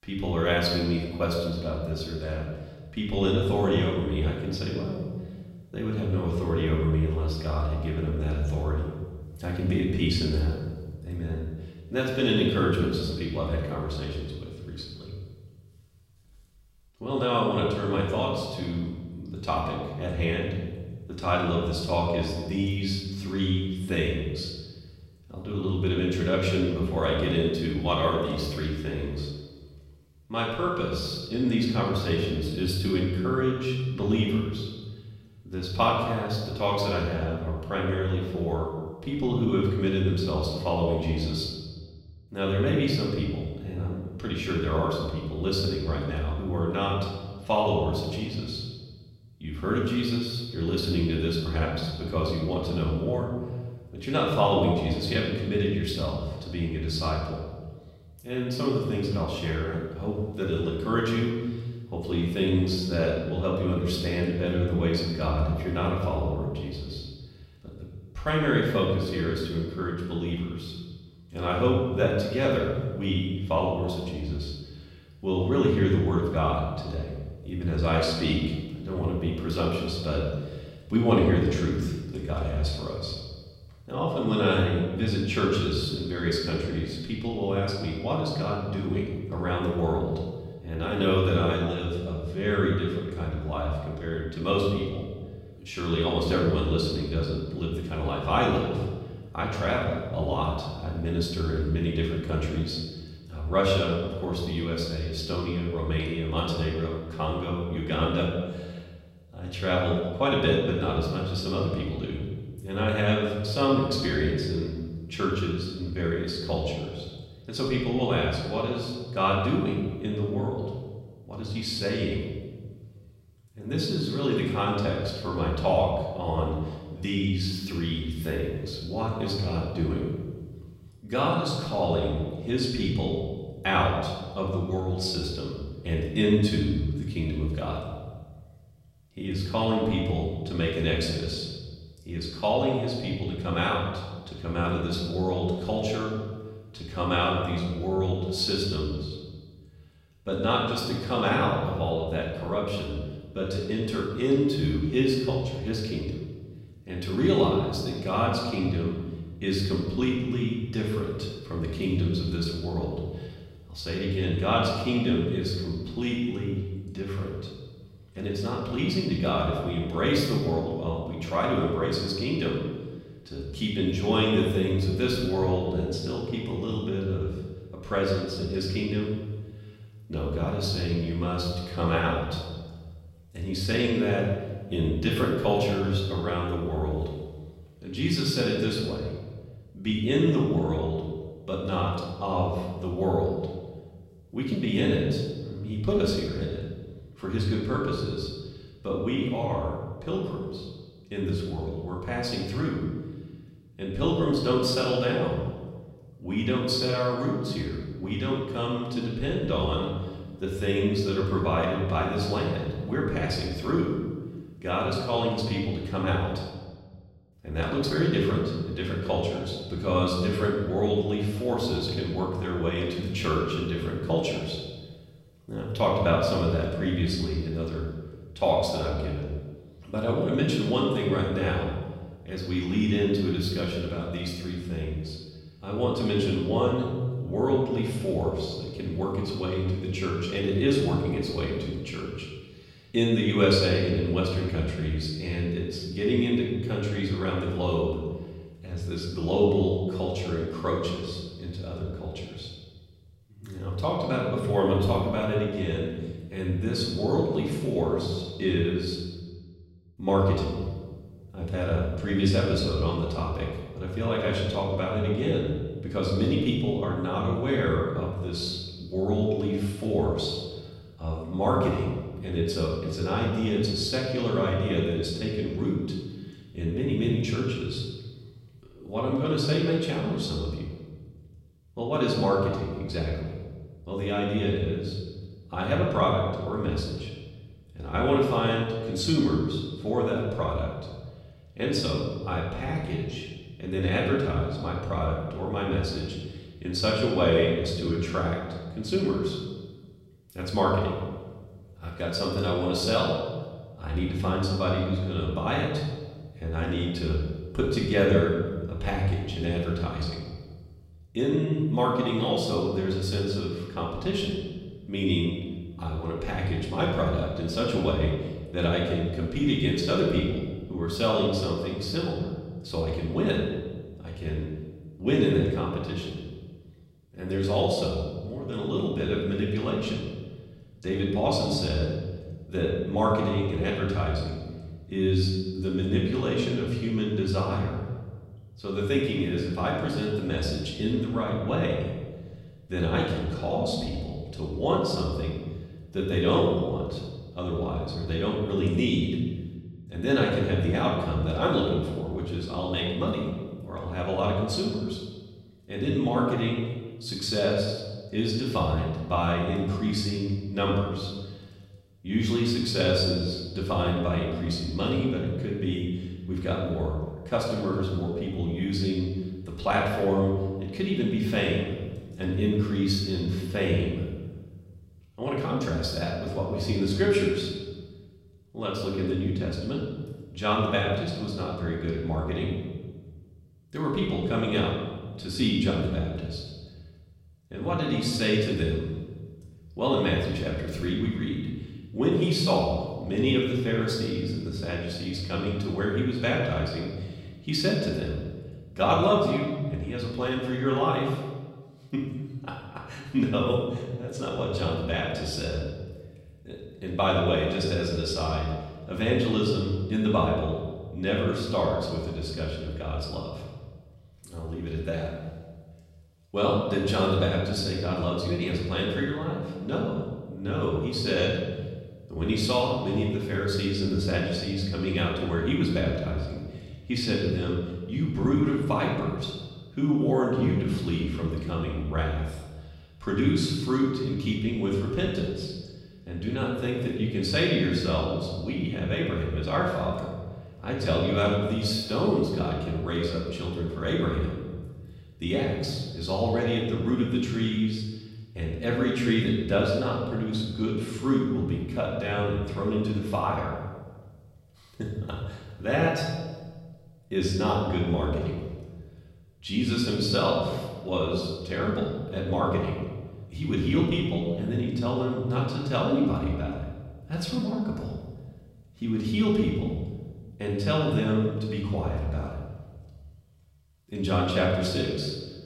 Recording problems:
off-mic speech; far
room echo; noticeable; dies away in 1.3 s

